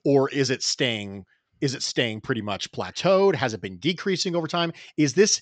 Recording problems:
high frequencies cut off; noticeable; nothing above 8 kHz

